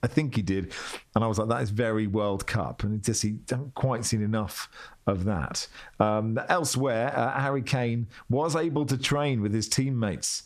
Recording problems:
squashed, flat; heavily

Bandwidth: 14 kHz